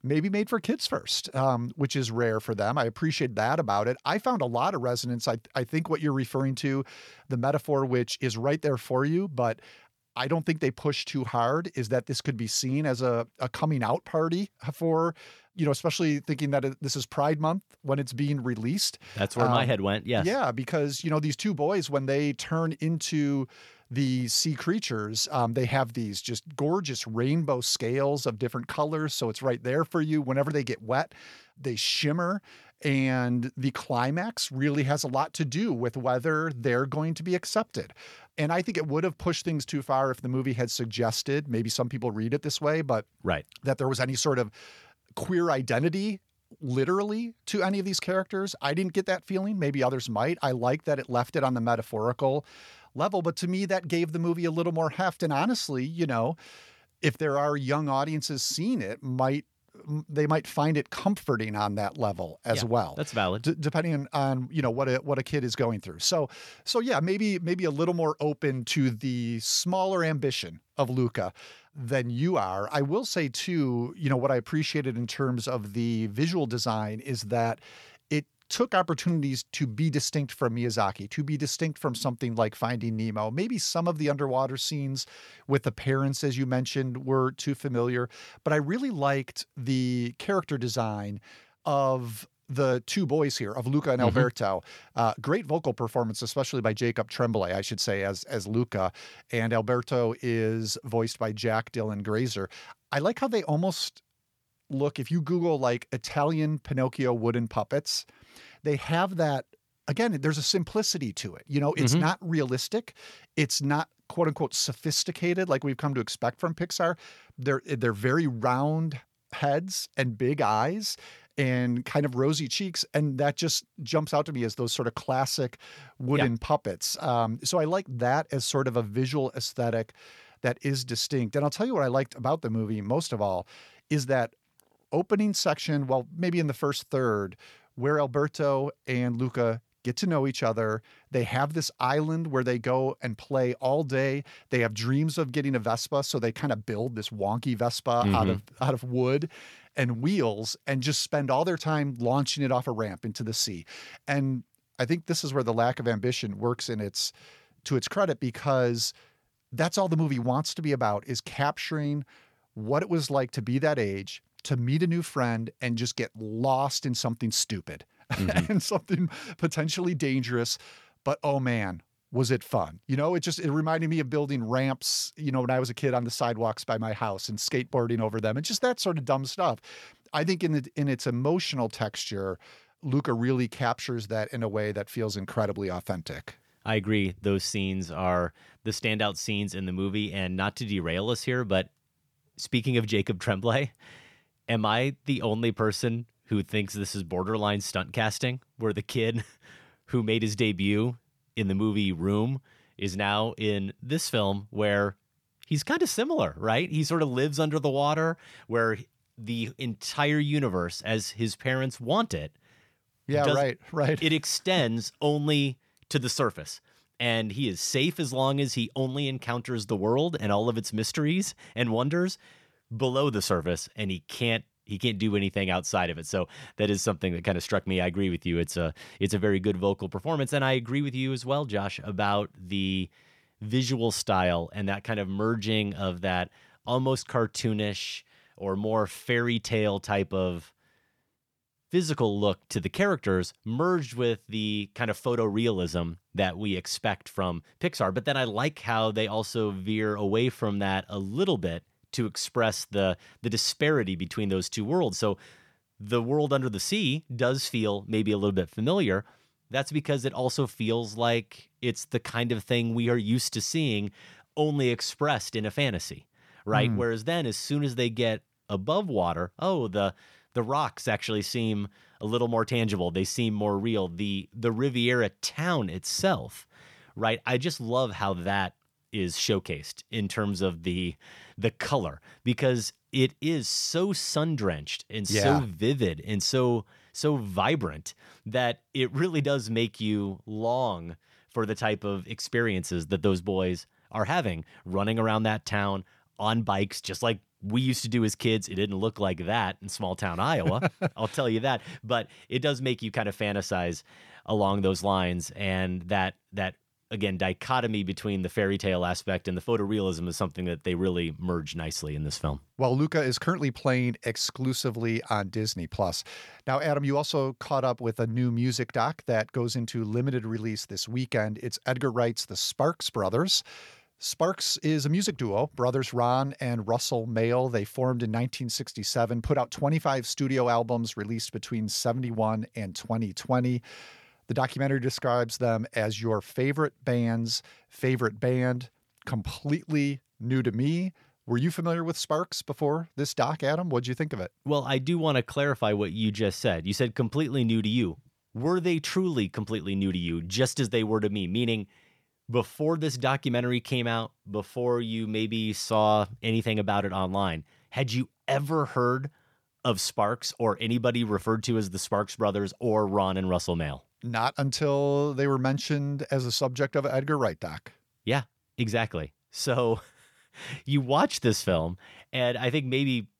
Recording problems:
none

